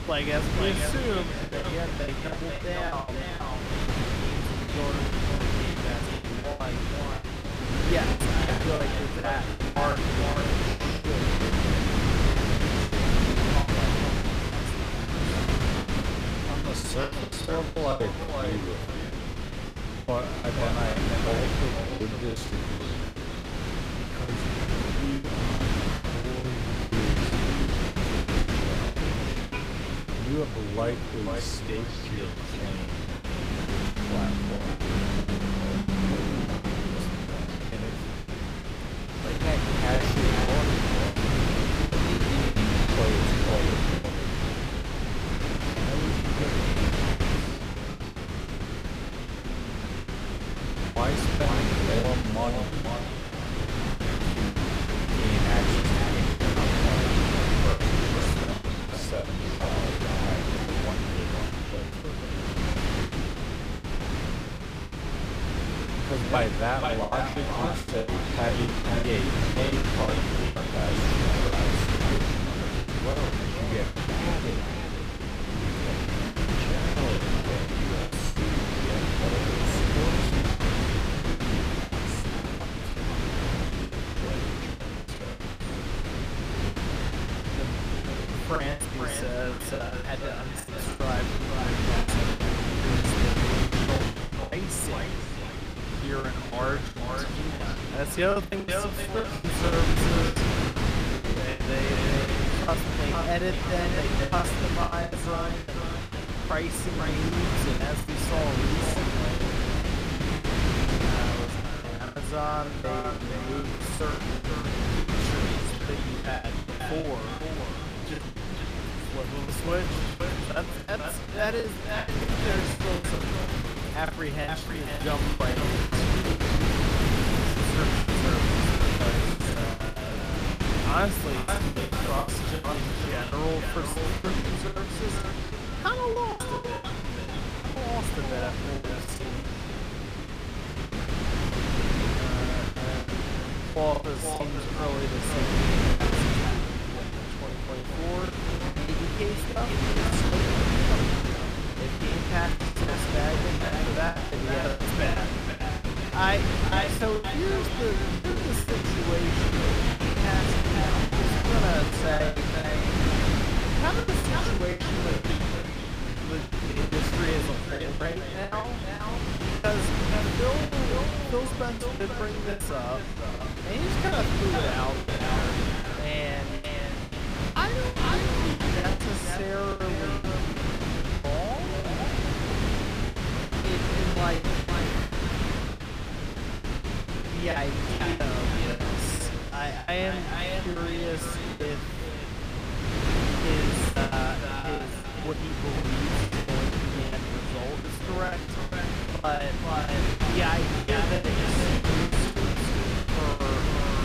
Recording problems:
echo of what is said; strong; throughout; 490 ms later, 6 dB below the speech
wrong speed, natural pitch; too slow; 0.7 times normal speed
wind noise on the microphone; heavy; 2 dB above the speech
traffic noise; noticeable; throughout; 15 dB below the speech
choppy; very; 14% of the speech affected

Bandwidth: 15 kHz